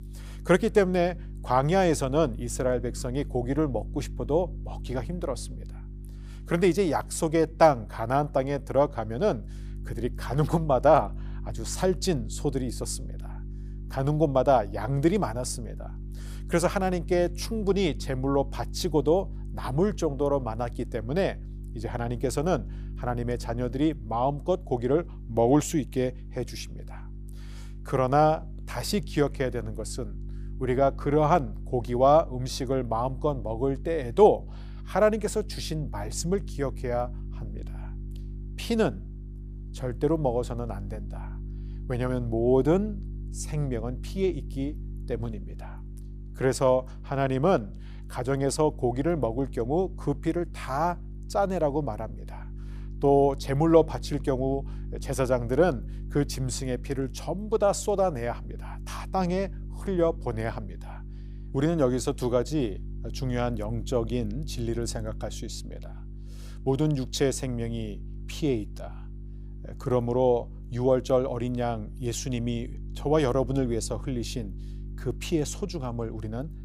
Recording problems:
electrical hum; faint; throughout; 50 Hz, 25 dB below the speech

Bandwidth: 15 kHz